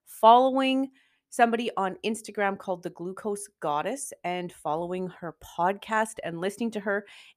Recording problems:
none

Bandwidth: 14.5 kHz